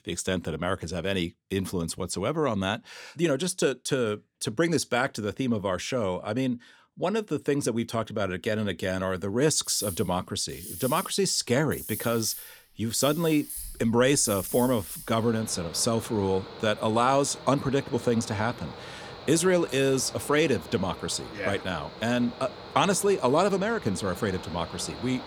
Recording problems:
machinery noise; noticeable; from 9.5 s on; 15 dB below the speech

